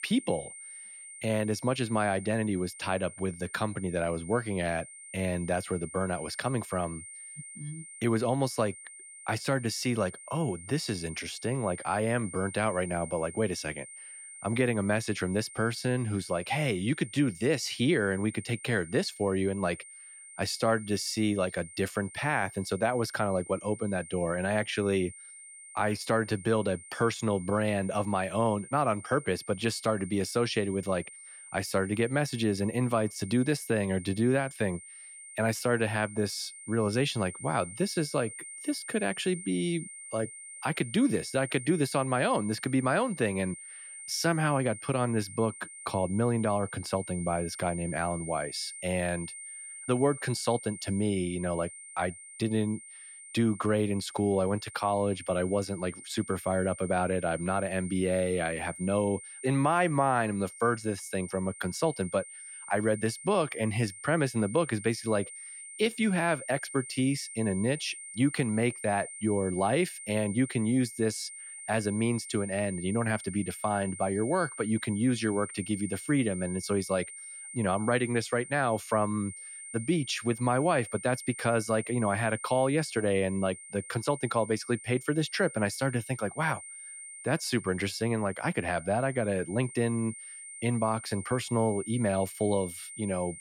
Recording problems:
high-pitched whine; noticeable; throughout; 9 kHz, 15 dB below the speech

